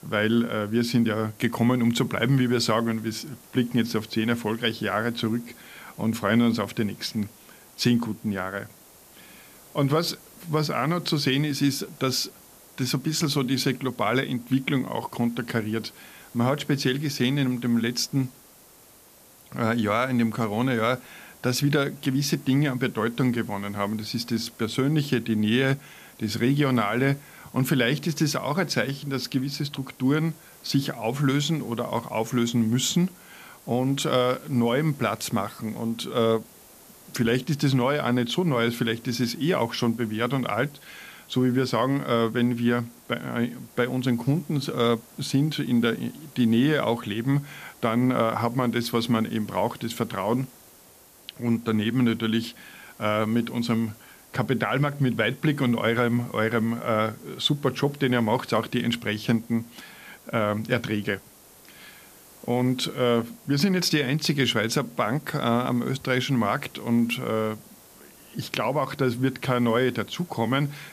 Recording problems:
hiss; faint; throughout; 25 dB below the speech

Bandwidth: 14.5 kHz